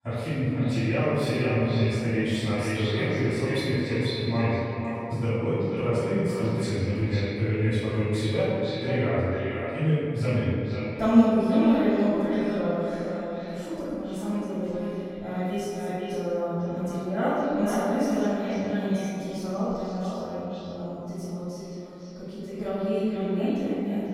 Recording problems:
echo of what is said; strong; throughout; 490 ms later, 7 dB below the speech
room echo; strong; dies away in 2.4 s
off-mic speech; far

